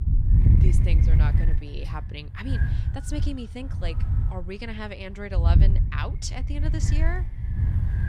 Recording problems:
wind noise on the microphone; heavy; 2 dB below the speech

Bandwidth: 14.5 kHz